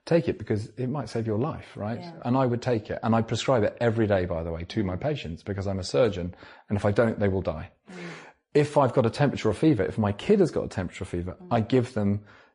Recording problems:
garbled, watery; slightly; nothing above 10.5 kHz

